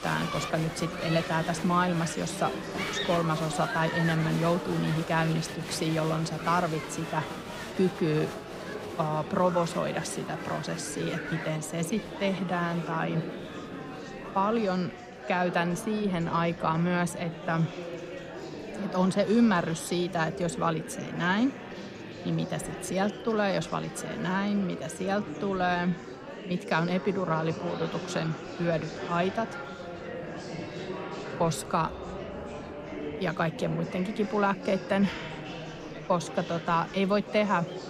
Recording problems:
murmuring crowd; loud; throughout; 8 dB below the speech

